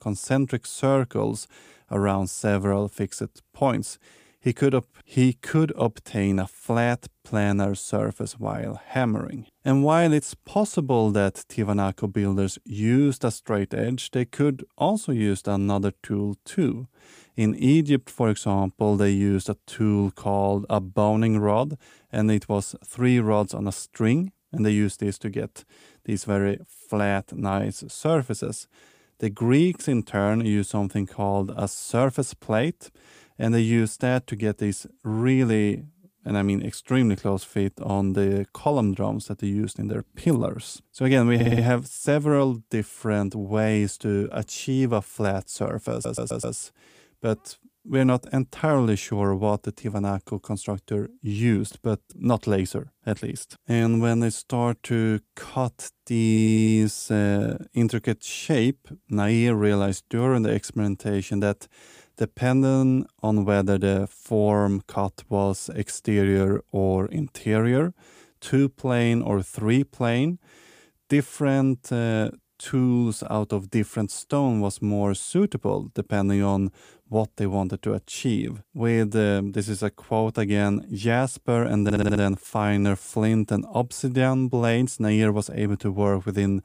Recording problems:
audio stuttering; 4 times, first at 41 s

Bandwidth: 15 kHz